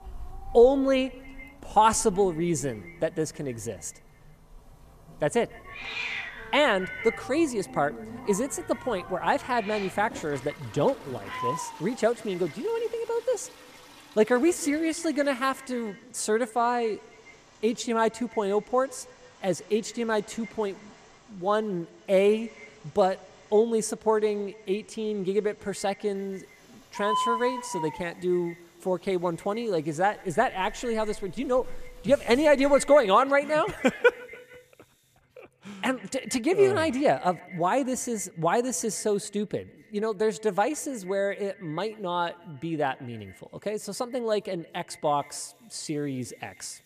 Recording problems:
echo of what is said; faint; throughout; 140 ms later, 20 dB below the speech
animal sounds; noticeable; until 33 s; 10 dB below the speech
household noises; faint; throughout; 25 dB below the speech

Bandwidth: 14.5 kHz